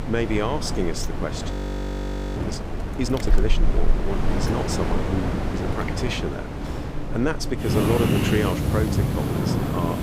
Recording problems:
wind in the background; very loud; throughout; 2 dB above the speech
background music; loud; throughout; 5 dB below the speech
audio freezing; at 1.5 s for 1 s

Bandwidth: 15.5 kHz